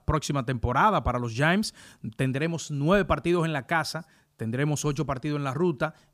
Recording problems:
none

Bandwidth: 15 kHz